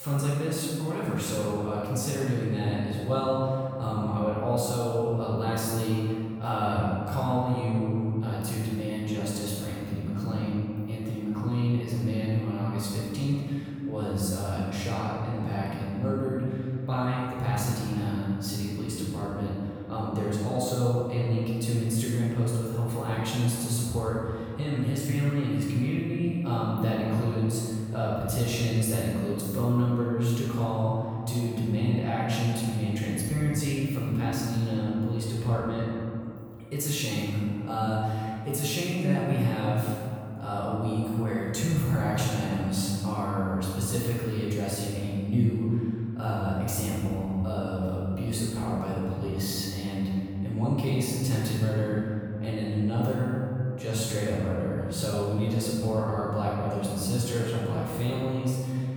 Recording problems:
room echo; strong; dies away in 2.3 s
off-mic speech; far
abrupt cut into speech; at the start

